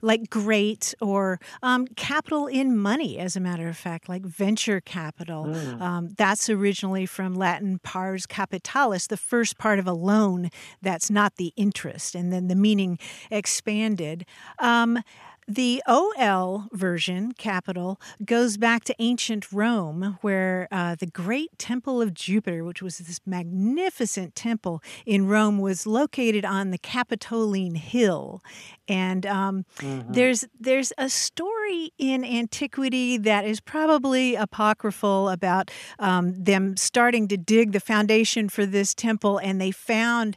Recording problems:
none

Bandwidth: 14.5 kHz